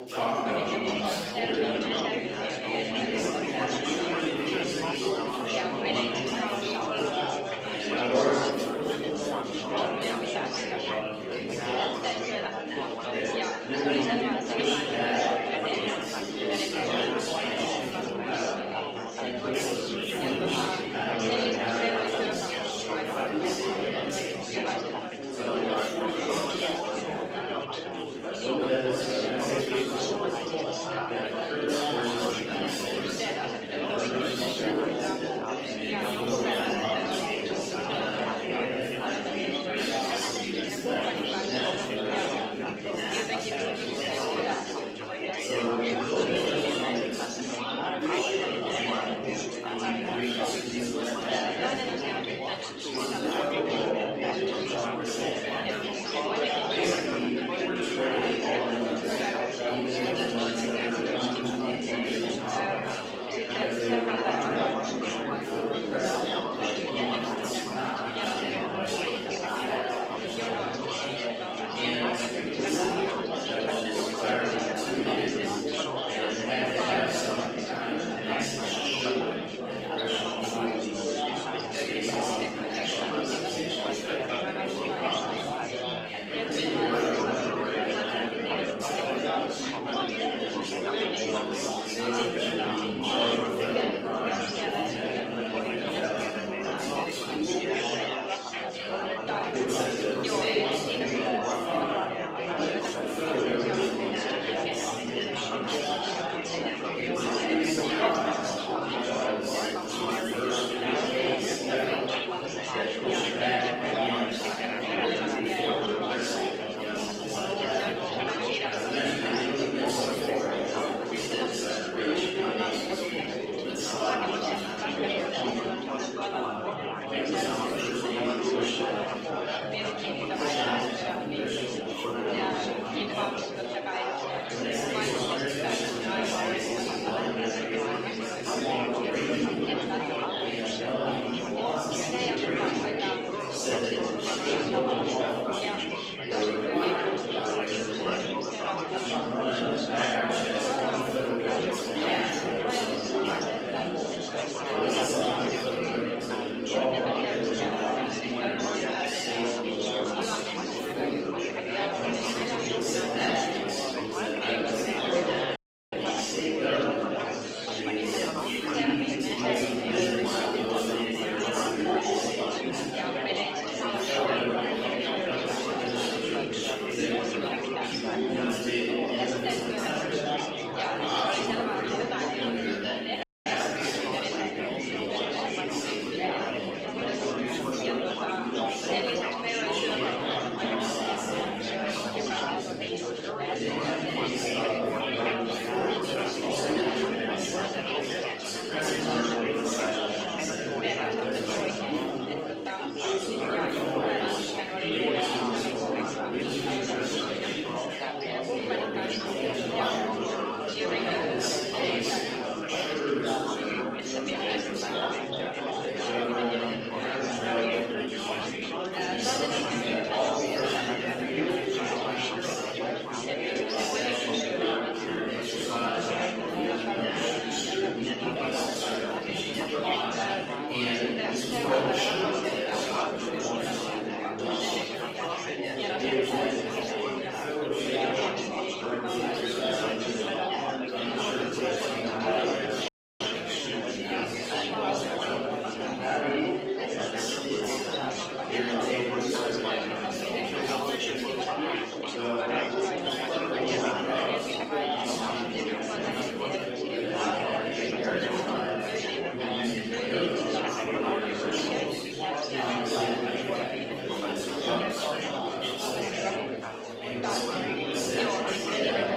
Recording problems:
room echo; strong; dies away in 1.8 s
off-mic speech; far
garbled, watery; slightly; nothing above 16 kHz
thin; very slightly; fading below 350 Hz
chatter from many people; very loud; throughout; 1 dB above the speech
audio cutting out; at 2:46, at 3:03 and at 4:03

